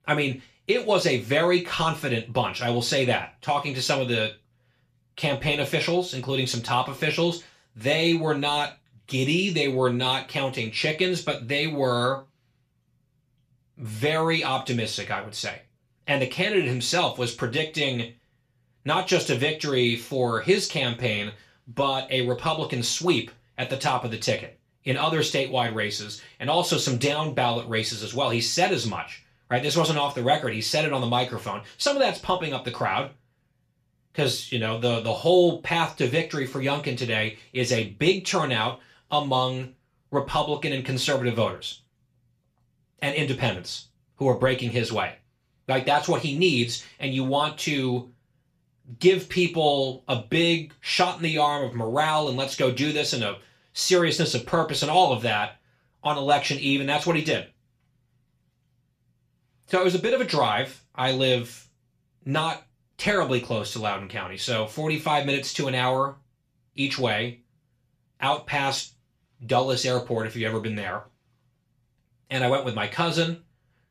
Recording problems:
room echo; very slight; dies away in 0.3 s
off-mic speech; somewhat distant

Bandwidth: 14.5 kHz